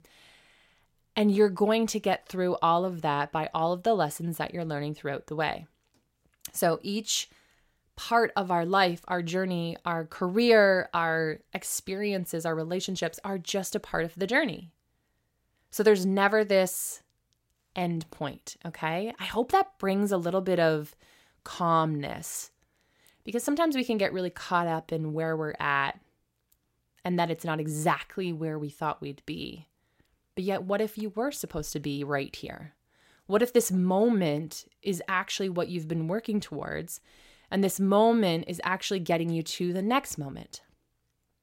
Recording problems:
none

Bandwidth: 16 kHz